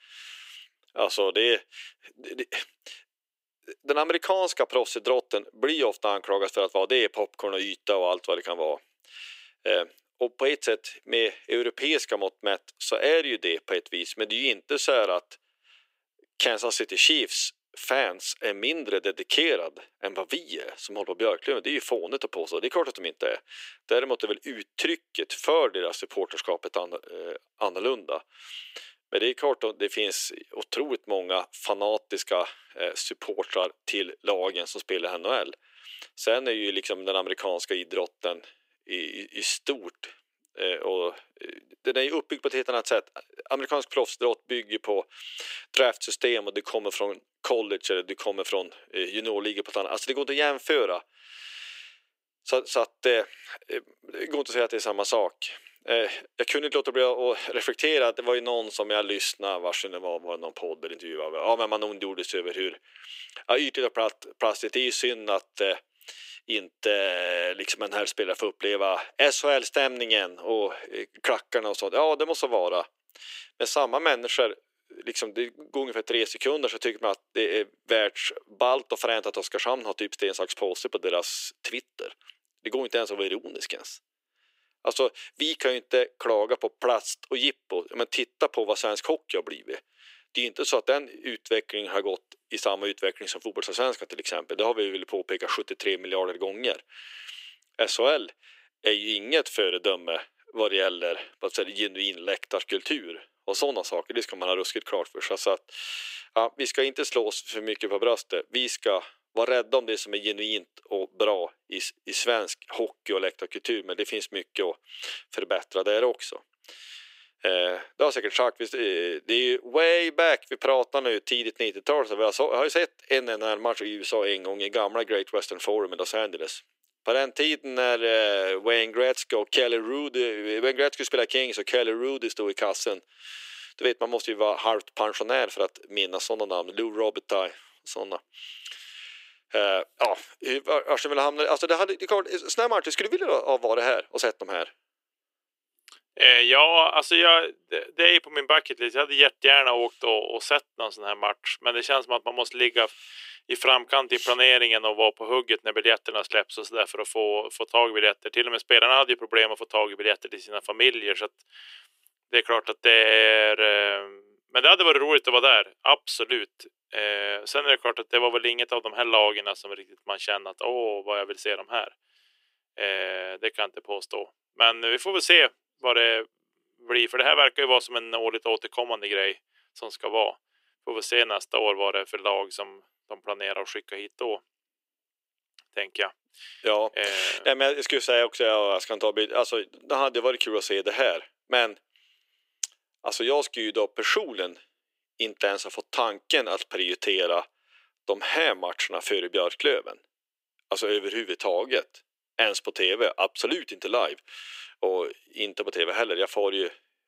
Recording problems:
thin; very; fading below 350 Hz

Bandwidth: 15.5 kHz